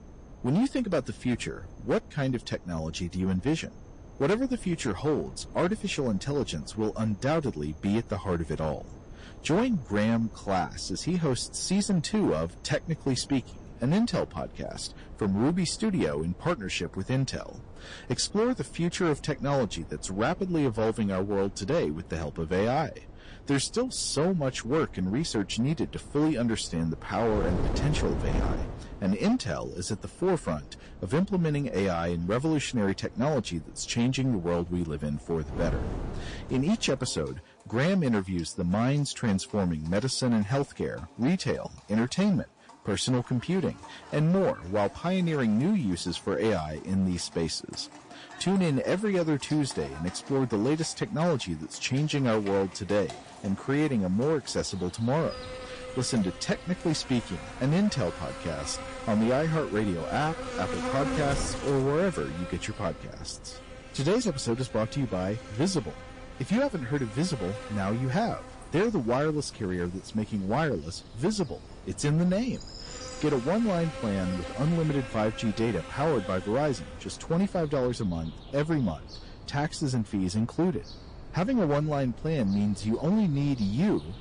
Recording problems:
distortion; slight; 8% of the sound clipped
garbled, watery; slightly
animal sounds; noticeable; throughout; 15 dB below the speech
wind noise on the microphone; occasional gusts; until 37 s and from 55 s on; 20 dB below the speech

